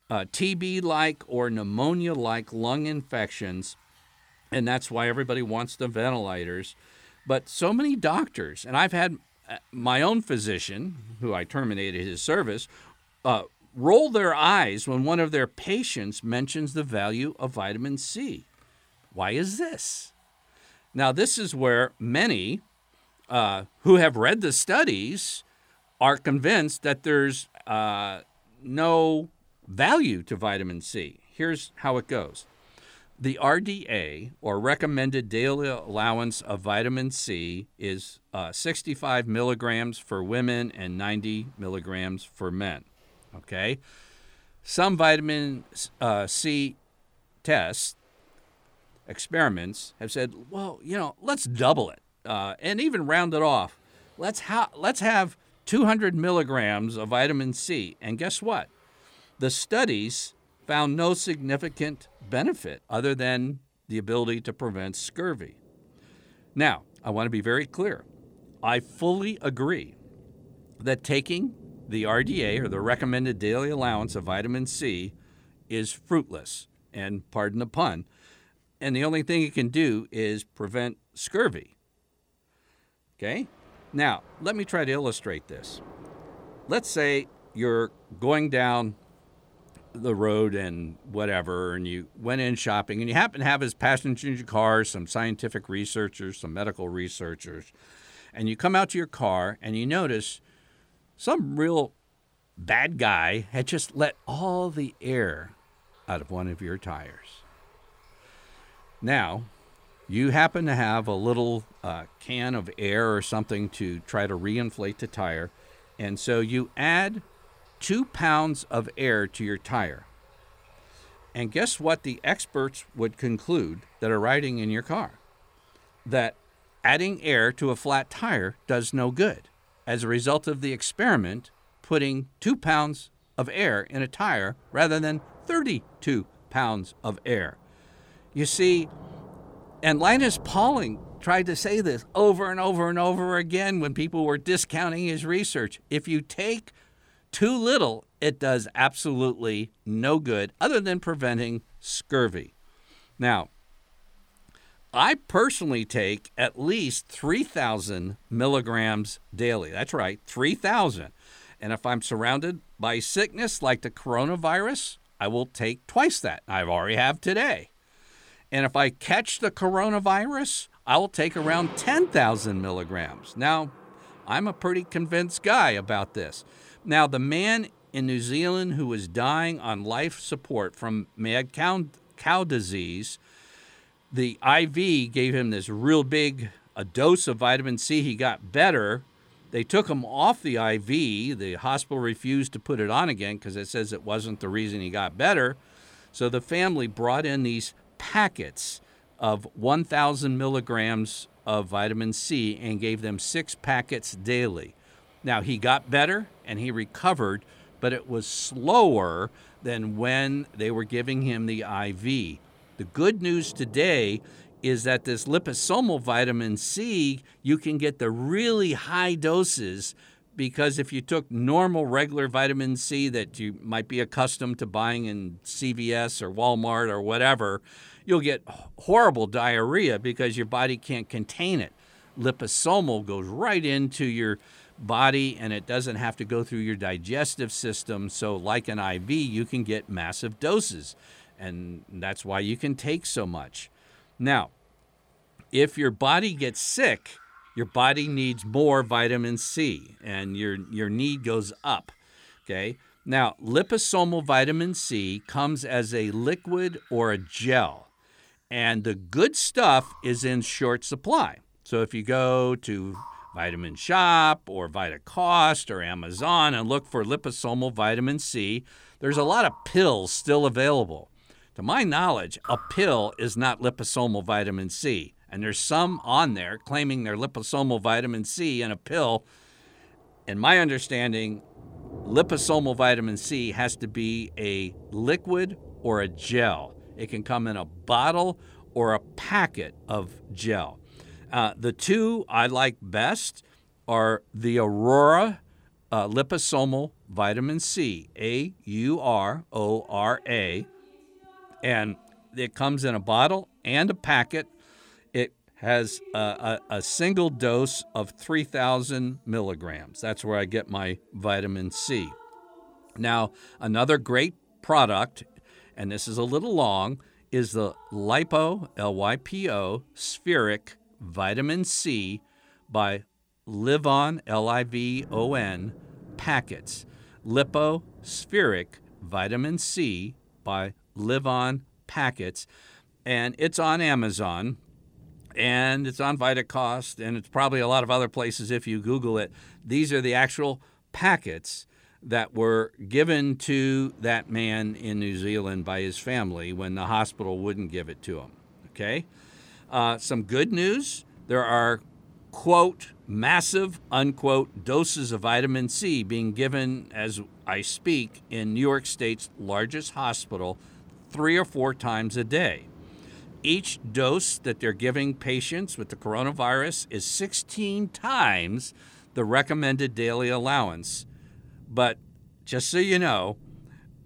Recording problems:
rain or running water; faint; throughout; 25 dB below the speech

